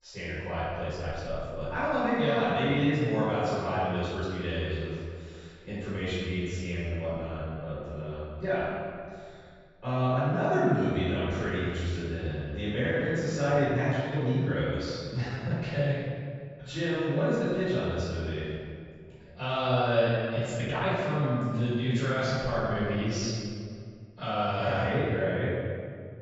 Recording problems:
room echo; strong; dies away in 1.9 s
off-mic speech; far
high frequencies cut off; noticeable; nothing above 8 kHz
uneven, jittery; strongly; from 1 to 24 s

